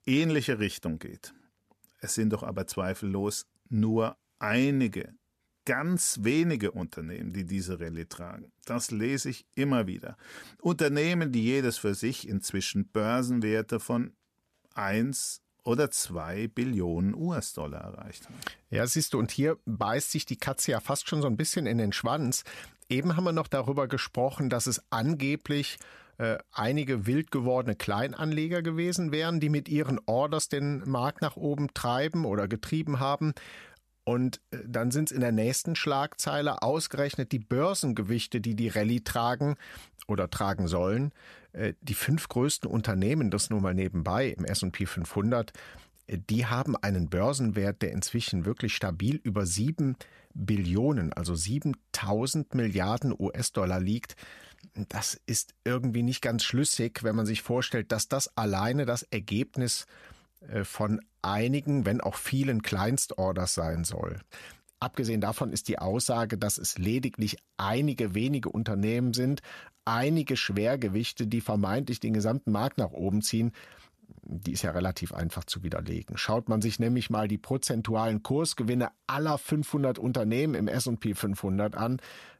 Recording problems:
none

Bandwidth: 14 kHz